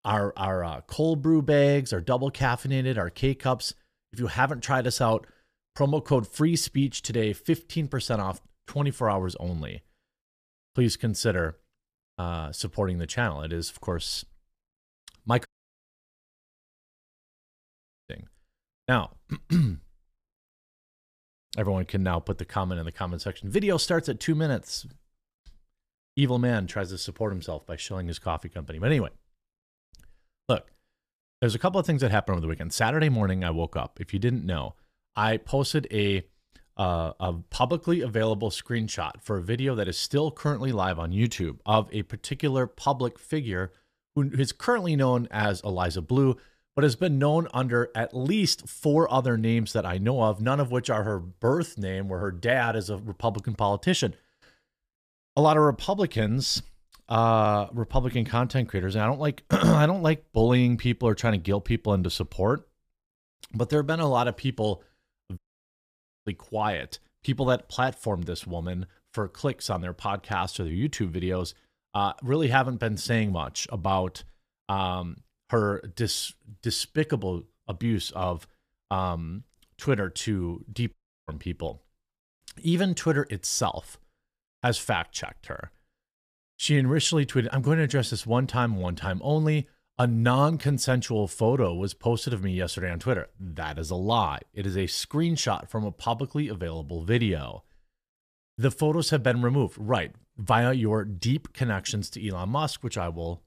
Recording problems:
audio cutting out; at 15 s for 2.5 s, at 1:05 for 1 s and at 1:21

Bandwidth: 14.5 kHz